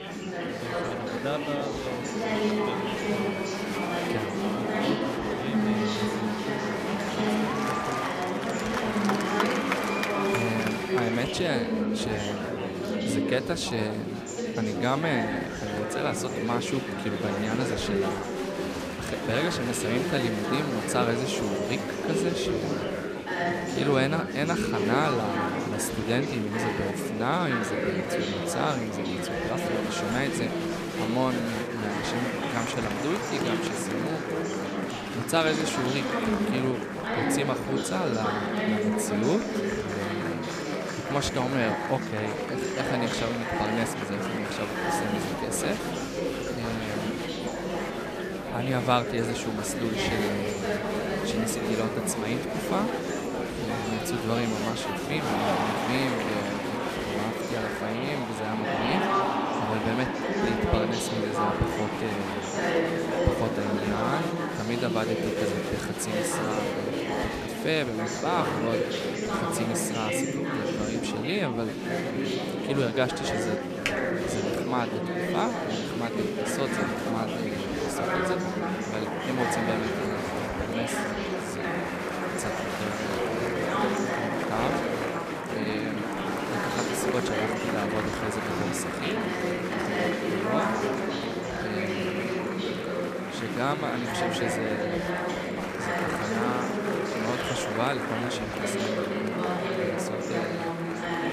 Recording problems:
chatter from many people; very loud; throughout; 3 dB above the speech
keyboard typing; loud; at 1:14; peak level with the speech

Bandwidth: 14.5 kHz